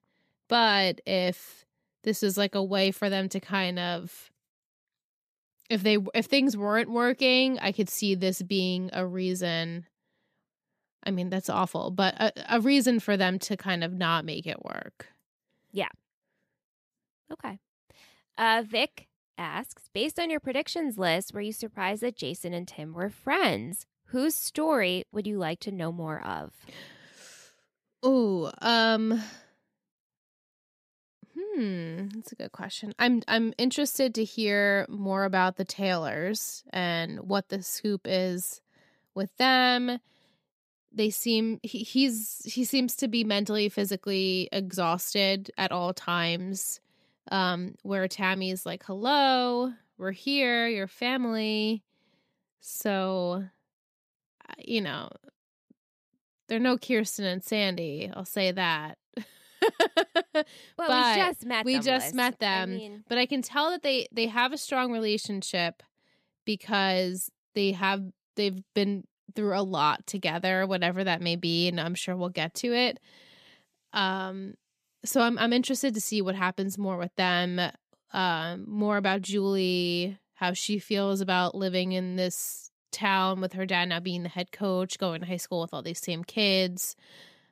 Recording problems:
none

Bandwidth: 14.5 kHz